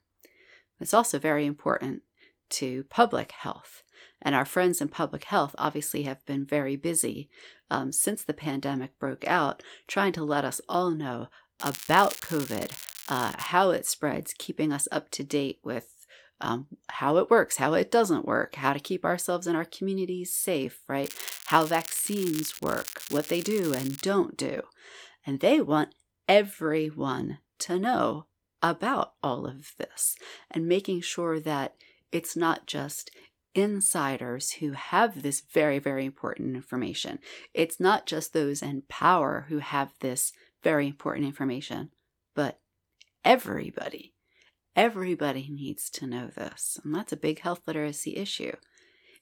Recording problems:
crackling; noticeable; from 12 to 13 s and from 21 to 24 s; 10 dB below the speech

